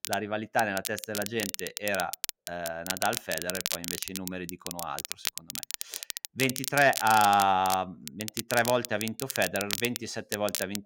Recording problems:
crackle, like an old record; loud; 6 dB below the speech

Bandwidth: 16 kHz